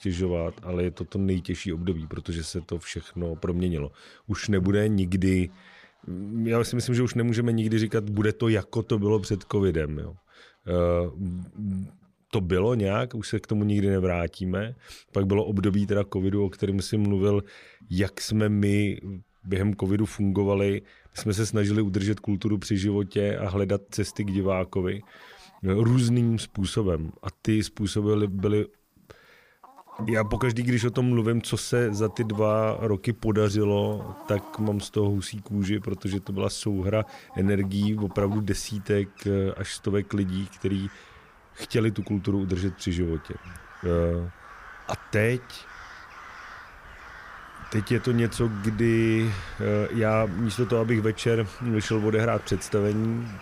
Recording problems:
animal sounds; noticeable; throughout; 20 dB below the speech

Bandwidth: 15 kHz